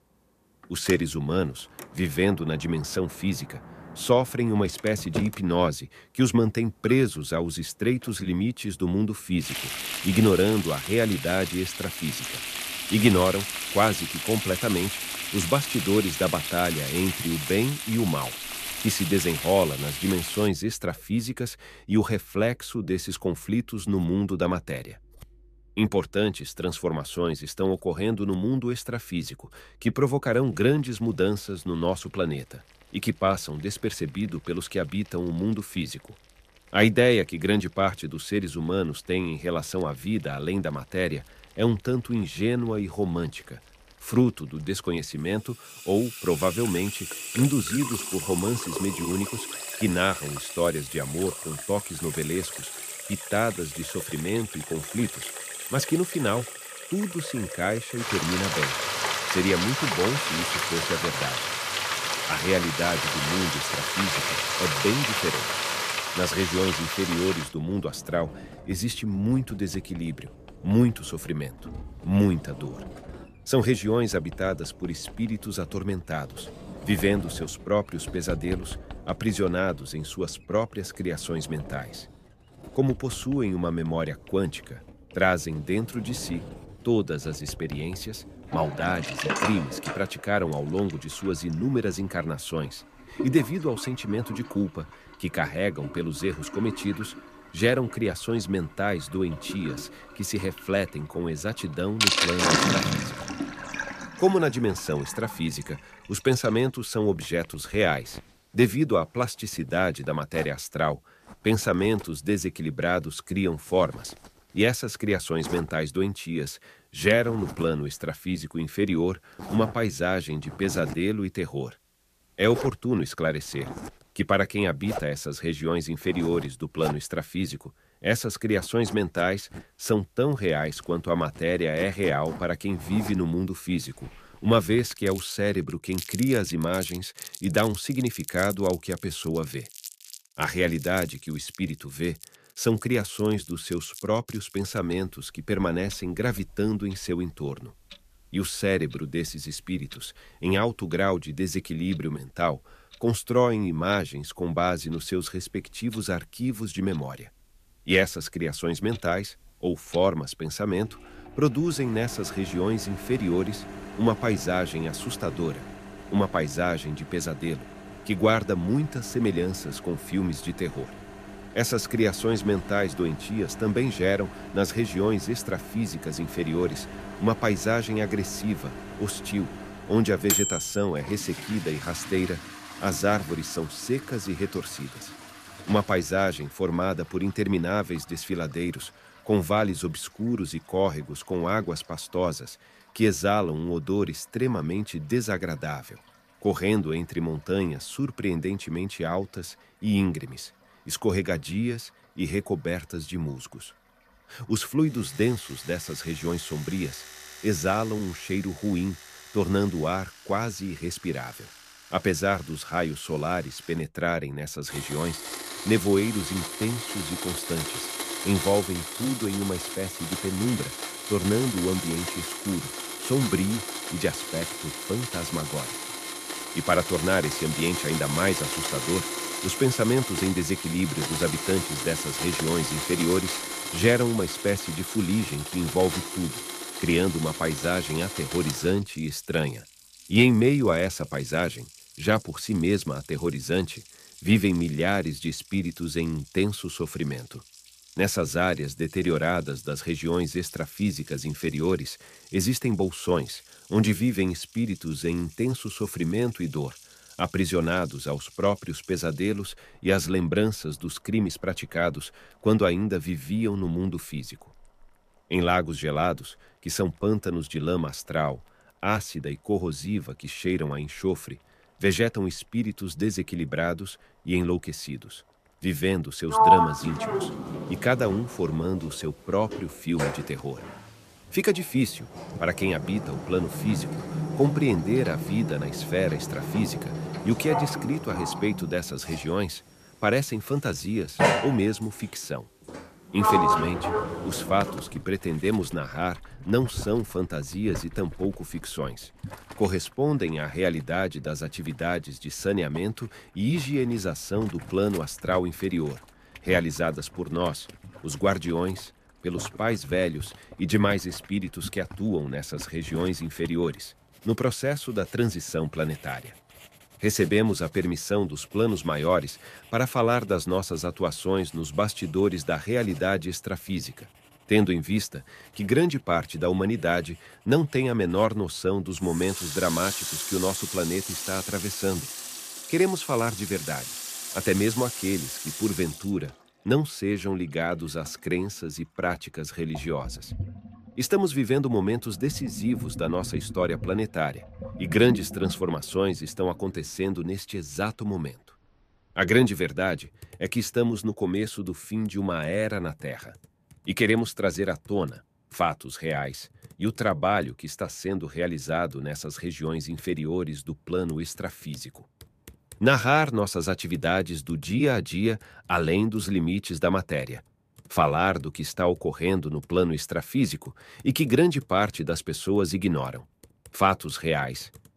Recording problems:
household noises; loud; throughout; 5 dB below the speech

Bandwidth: 14.5 kHz